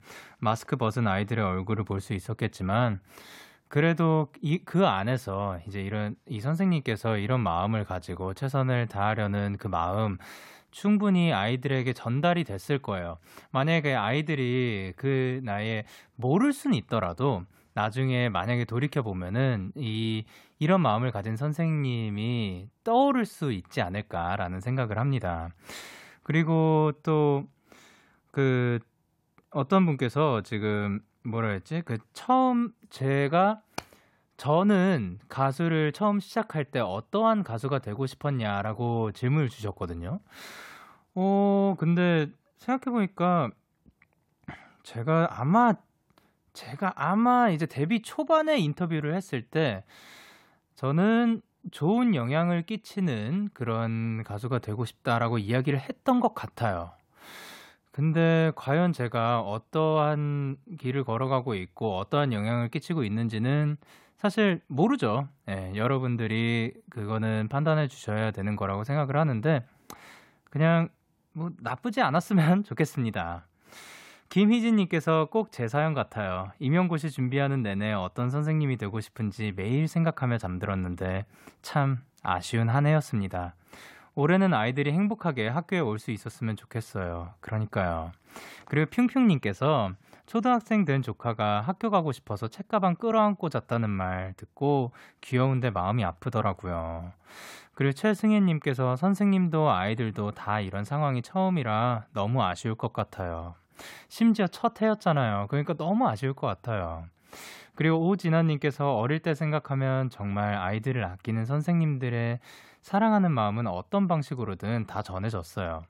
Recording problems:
none

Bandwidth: 16 kHz